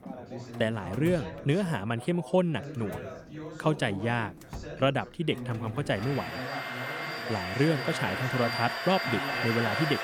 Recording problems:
echo of what is said; noticeable; from 7.5 s on; 470 ms later, 15 dB below the speech
household noises; loud; throughout; 4 dB below the speech
background chatter; noticeable; throughout; 4 voices, 10 dB below the speech

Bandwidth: 18.5 kHz